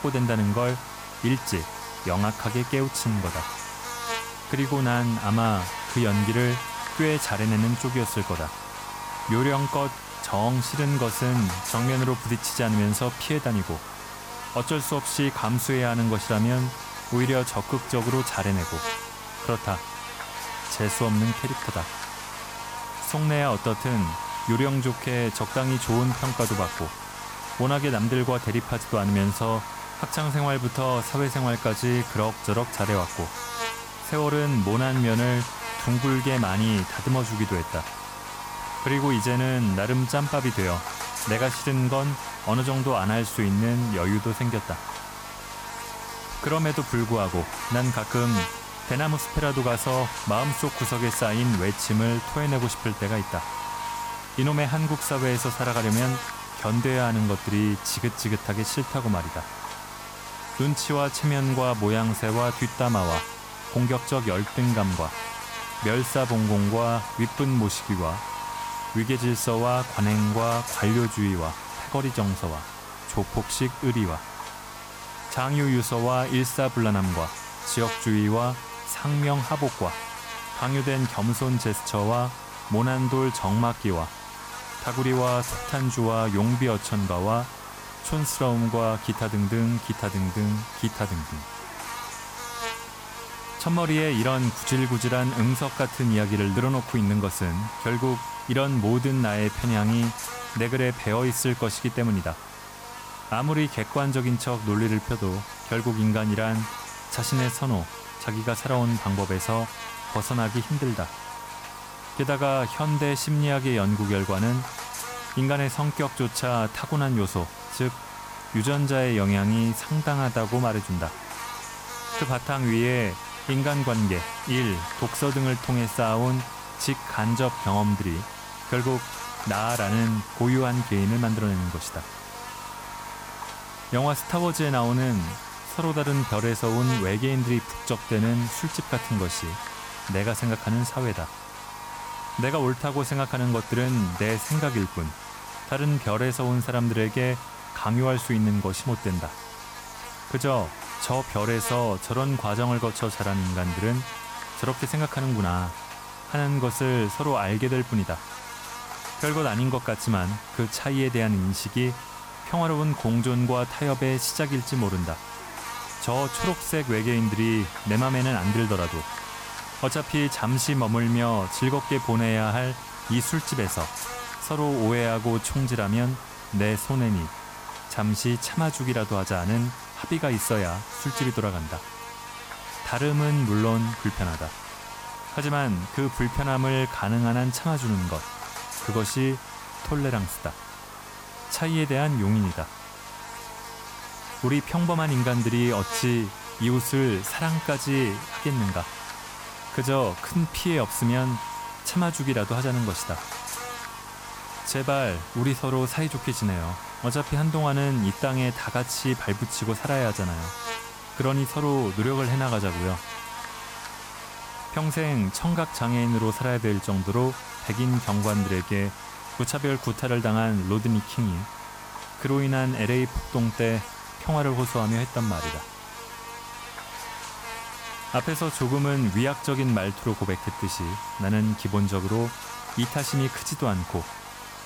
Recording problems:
electrical hum; loud; throughout; 50 Hz, 5 dB below the speech

